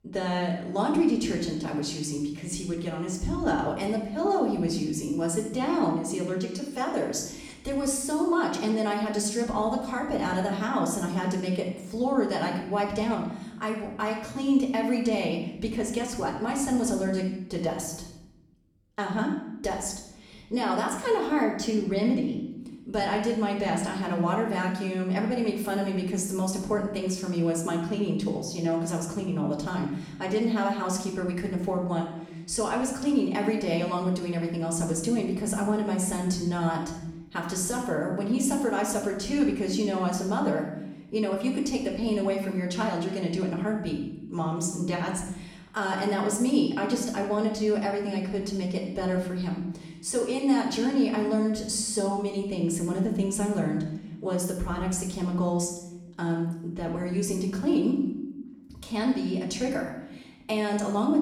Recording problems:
off-mic speech; far
room echo; noticeable; dies away in 0.8 s

